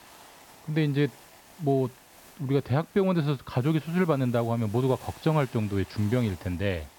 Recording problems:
high frequencies cut off; noticeable; nothing above 5.5 kHz
hiss; faint; throughout; 20 dB below the speech

